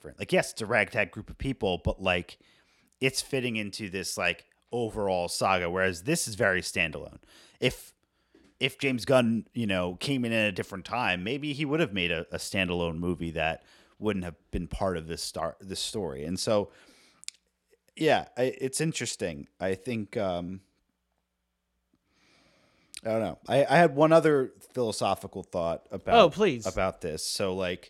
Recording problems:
none

